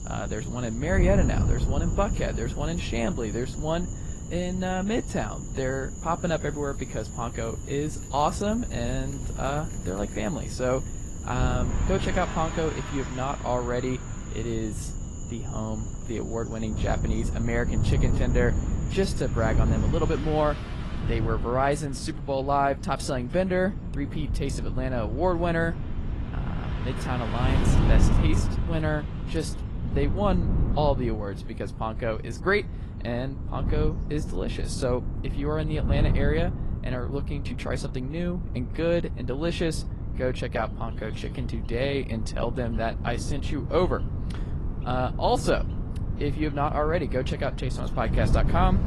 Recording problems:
garbled, watery; slightly; nothing above 11.5 kHz
animal sounds; noticeable; throughout; 15 dB below the speech
traffic noise; noticeable; throughout; 15 dB below the speech
wind noise on the microphone; occasional gusts; 15 dB below the speech

